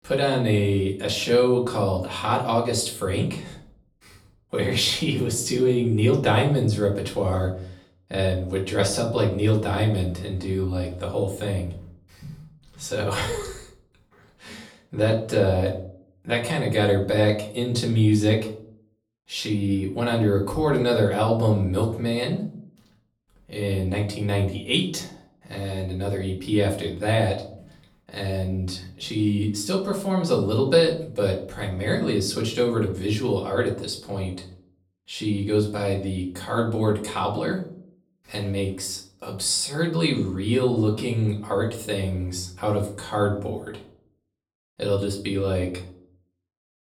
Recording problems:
off-mic speech; far
room echo; slight; dies away in 0.4 s

